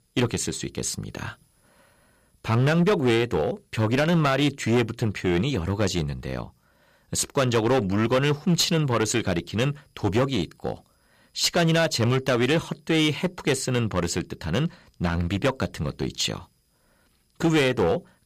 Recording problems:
distortion; slight; 7% of the sound clipped

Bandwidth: 14.5 kHz